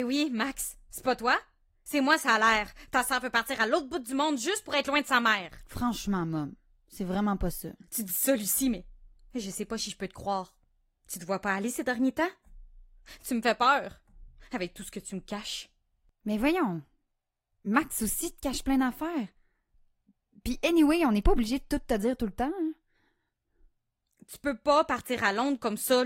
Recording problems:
garbled, watery; slightly; nothing above 16 kHz
abrupt cut into speech; at the start and the end

